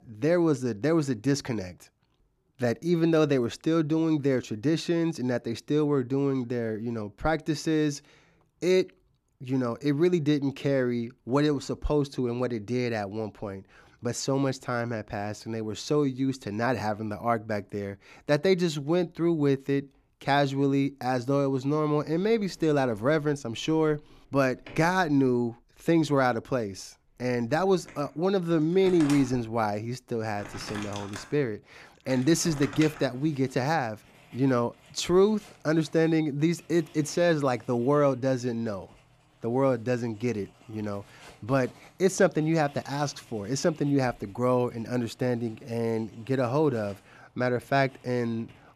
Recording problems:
household noises; faint; from 22 s on; 20 dB below the speech

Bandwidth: 14.5 kHz